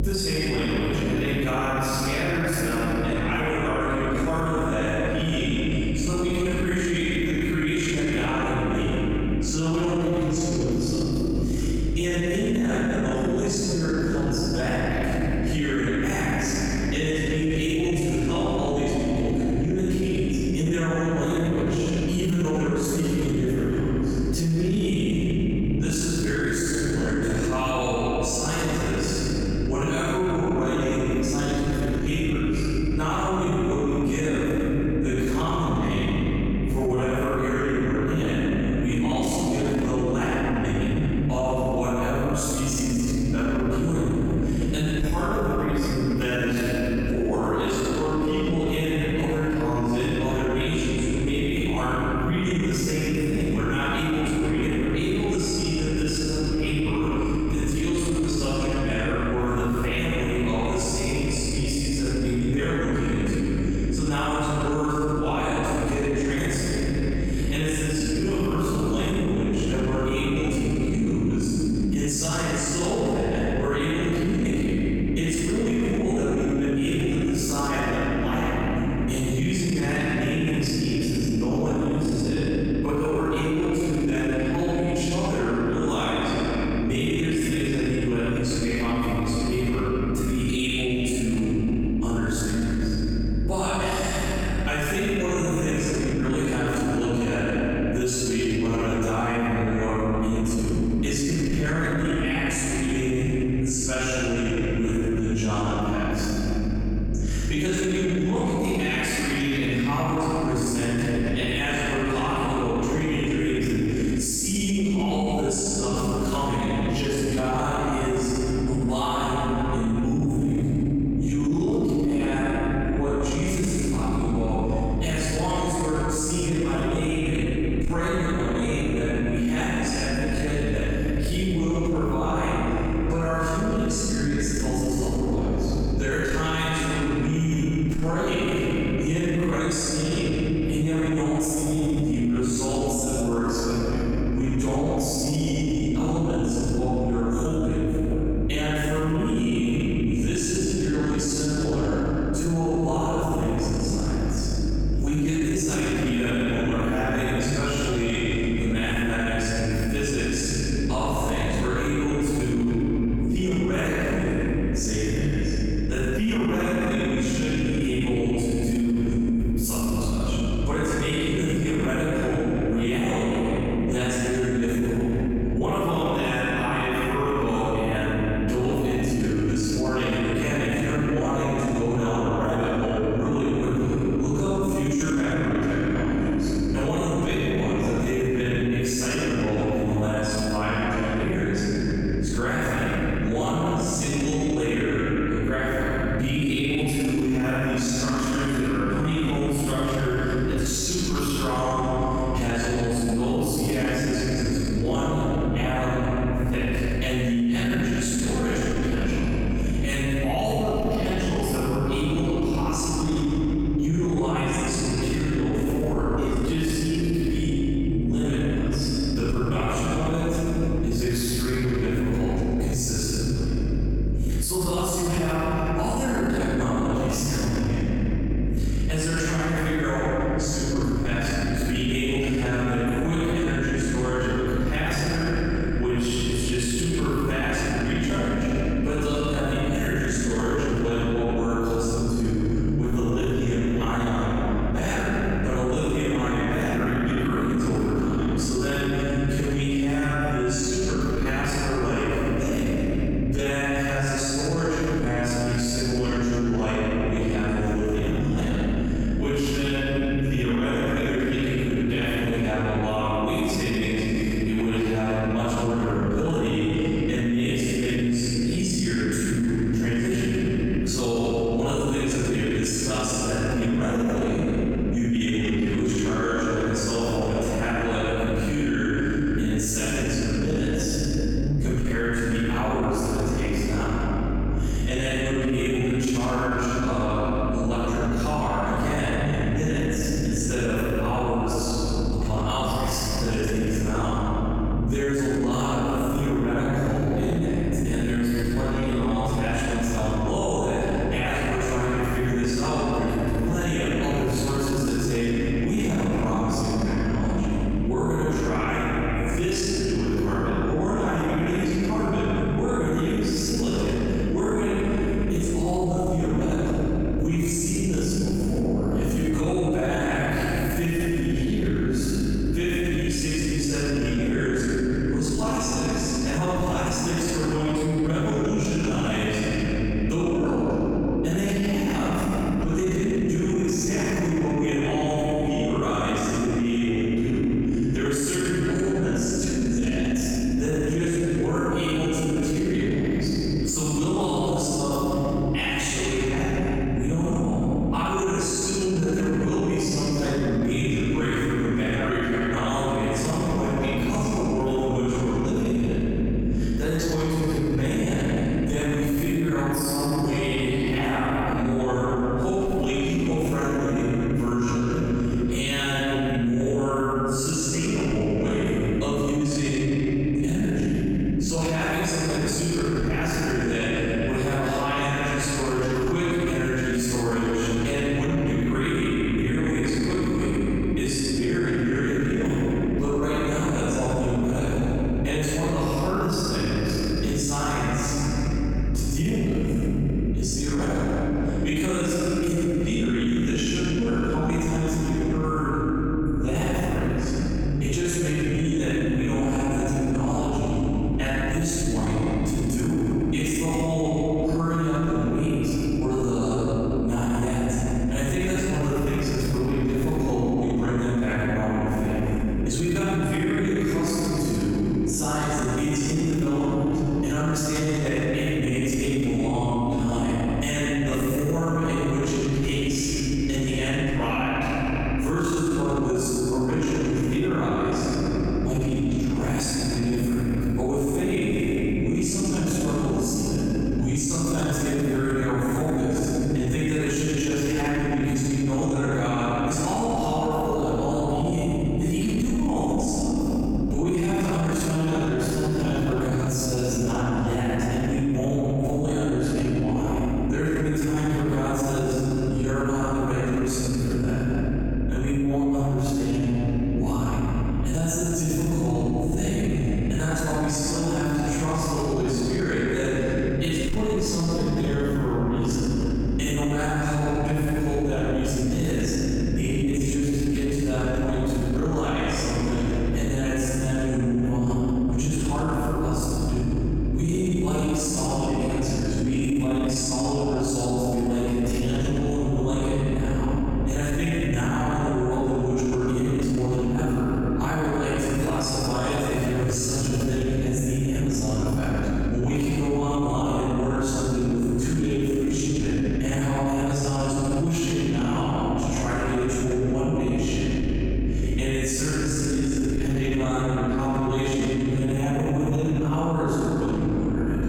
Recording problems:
room echo; strong; dies away in 3 s
off-mic speech; far
squashed, flat; somewhat
electrical hum; noticeable; throughout; 50 Hz, 20 dB below the speech

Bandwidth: 17.5 kHz